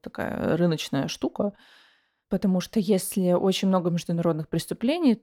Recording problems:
none

